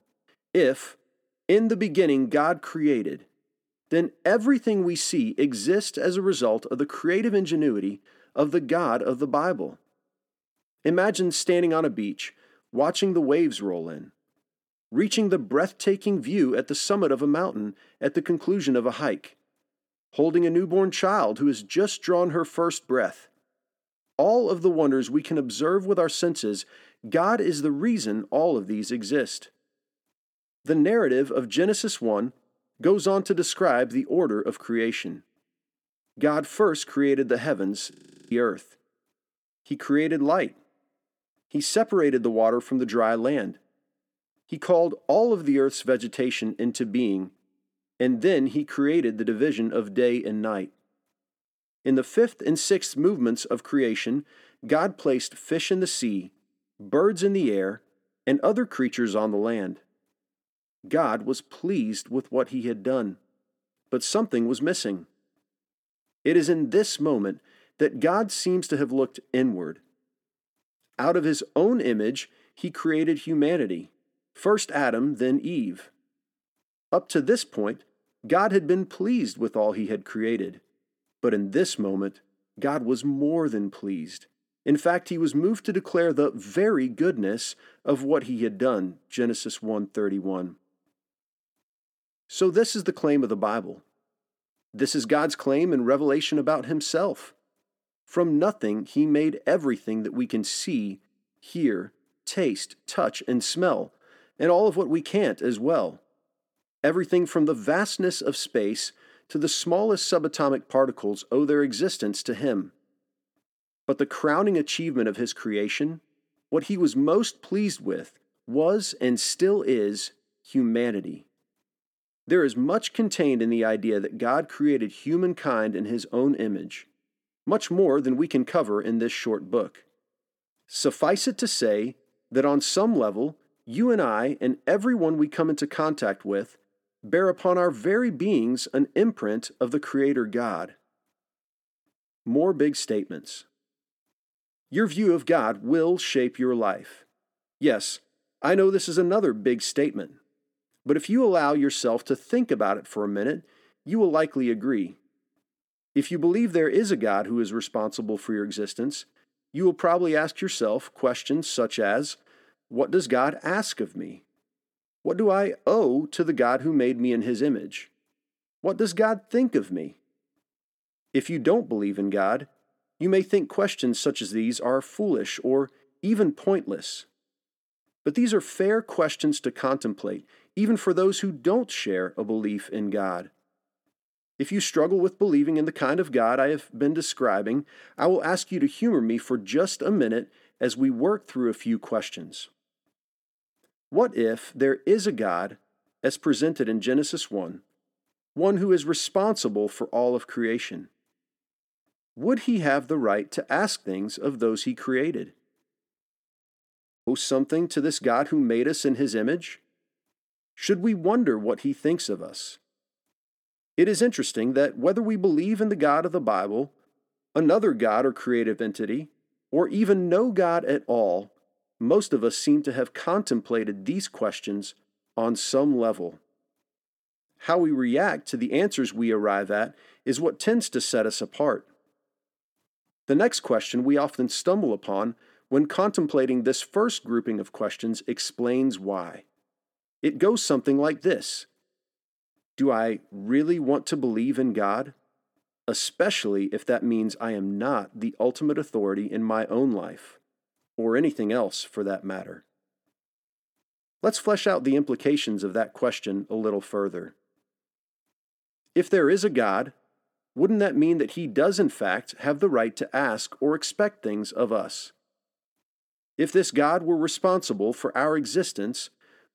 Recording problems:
audio freezing; at 38 s and at 3:26 for 1 s

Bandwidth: 17 kHz